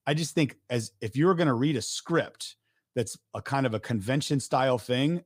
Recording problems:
none

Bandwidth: 15.5 kHz